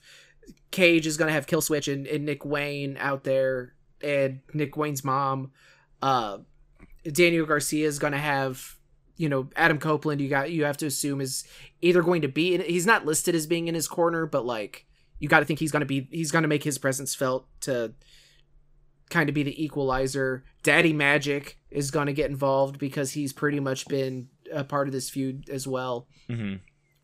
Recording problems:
uneven, jittery; strongly; from 1.5 to 25 s

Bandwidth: 15.5 kHz